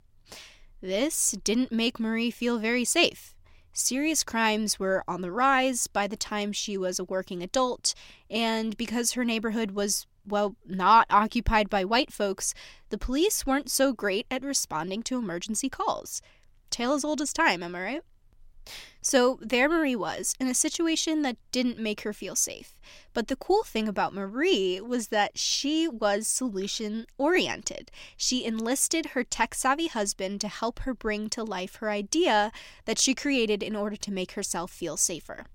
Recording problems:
none

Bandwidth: 16.5 kHz